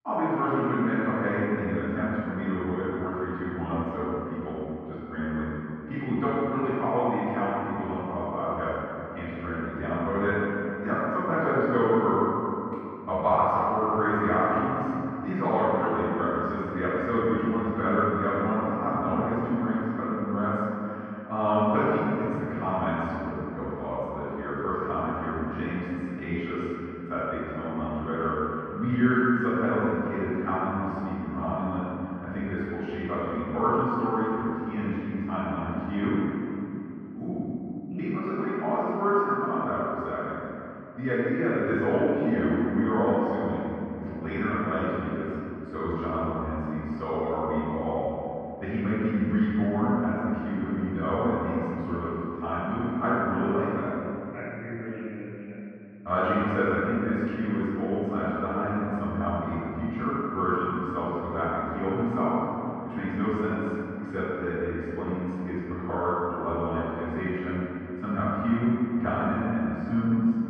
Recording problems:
room echo; strong; dies away in 2.8 s
off-mic speech; far
muffled; very; fading above 2 kHz

